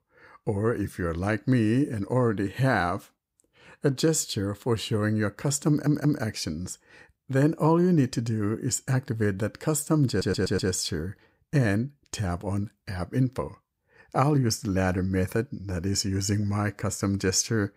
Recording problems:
audio stuttering; at 5.5 s and at 10 s

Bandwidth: 15.5 kHz